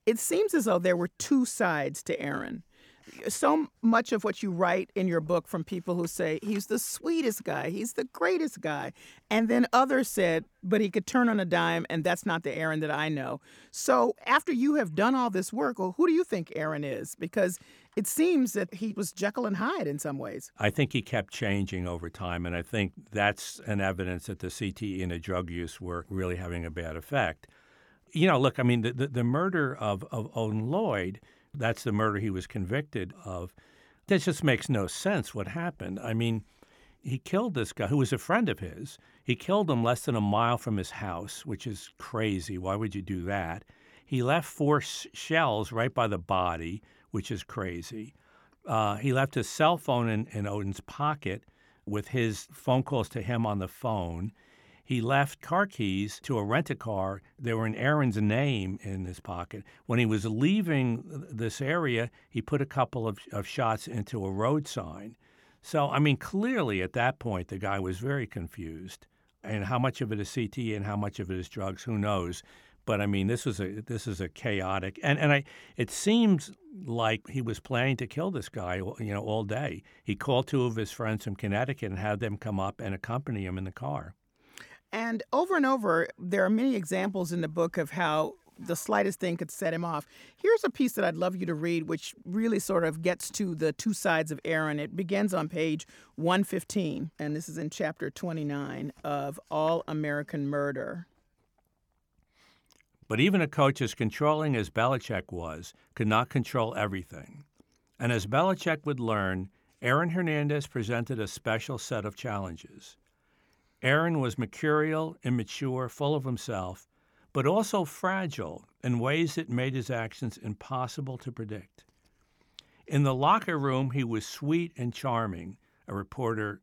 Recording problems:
none

